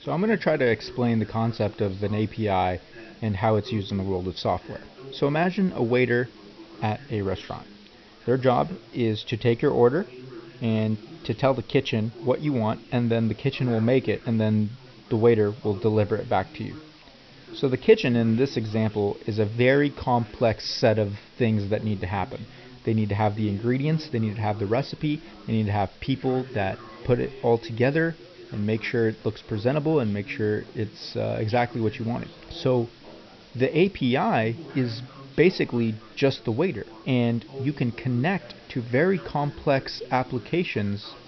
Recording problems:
high frequencies cut off; noticeable; nothing above 5.5 kHz
chatter from many people; faint; throughout; 20 dB below the speech
hiss; faint; throughout; 25 dB below the speech

